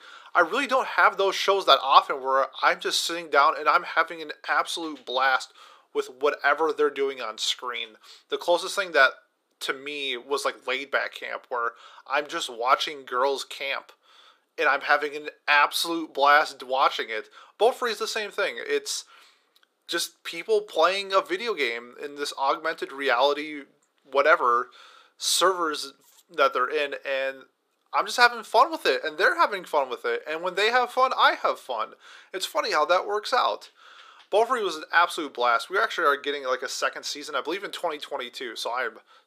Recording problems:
thin; very; fading below 350 Hz

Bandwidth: 15 kHz